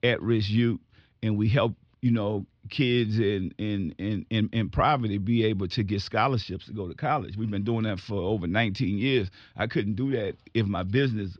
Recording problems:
muffled; very slightly; fading above 4.5 kHz

